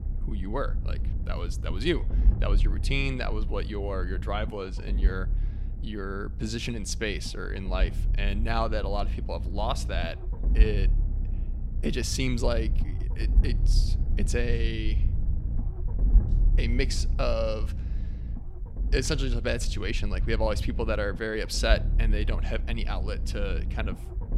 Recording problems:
low rumble; noticeable; throughout; 15 dB below the speech

